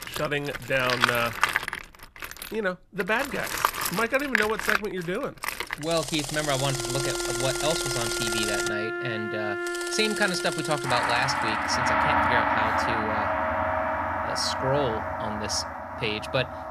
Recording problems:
background music; very loud; from 6.5 s on; 1 dB above the speech
machinery noise; loud; until 11 s; 1 dB below the speech

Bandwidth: 14 kHz